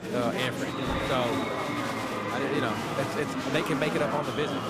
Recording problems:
murmuring crowd; very loud; throughout; 1 dB above the speech

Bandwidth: 15 kHz